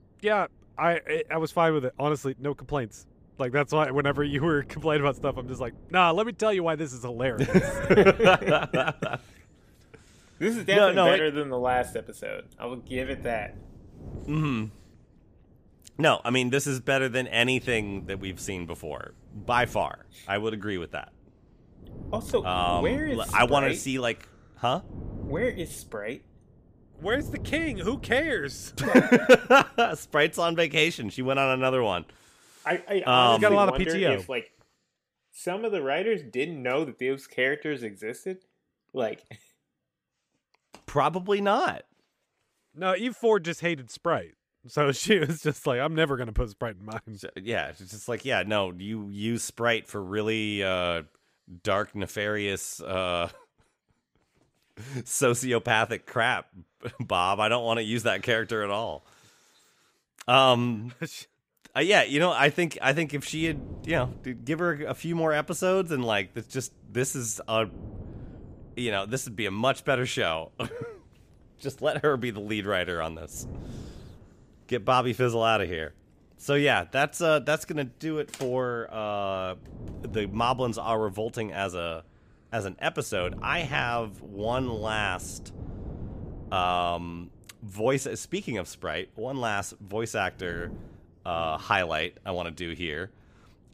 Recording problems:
wind noise on the microphone; occasional gusts; until 32 s and from 1:03 on; 25 dB below the speech

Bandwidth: 15 kHz